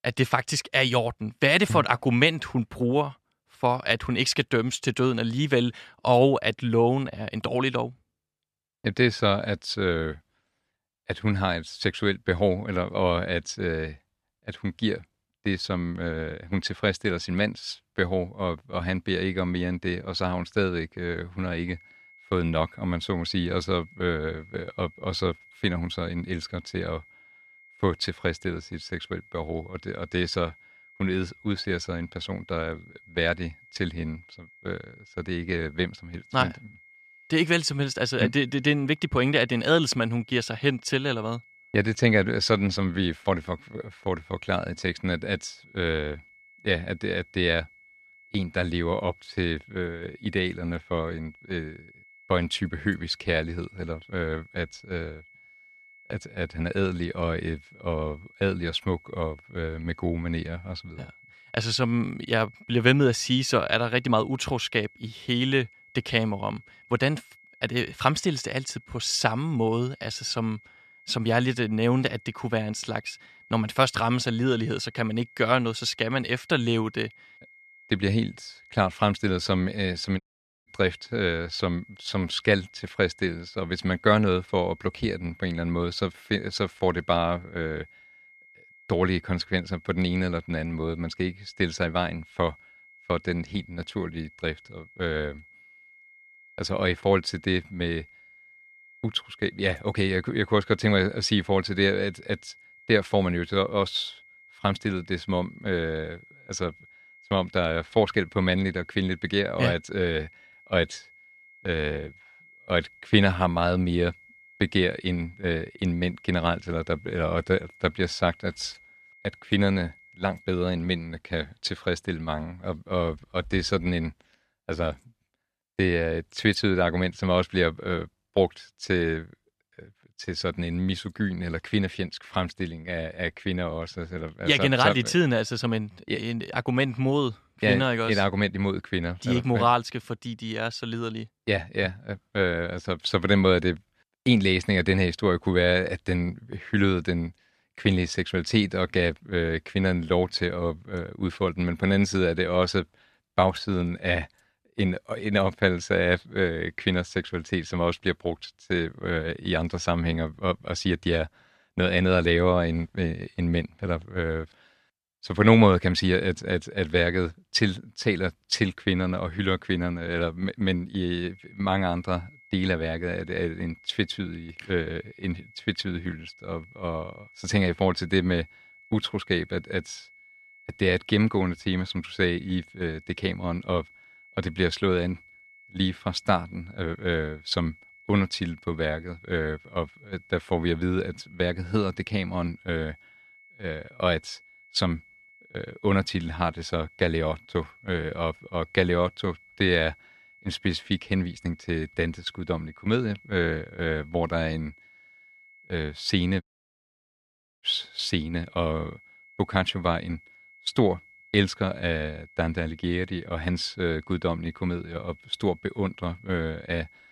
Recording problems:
high-pitched whine; faint; from 22 s to 2:01 and from 2:51 on; 2 kHz, 25 dB below the speech
audio cutting out; at 1:20 and at 3:26 for 1 s

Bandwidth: 13.5 kHz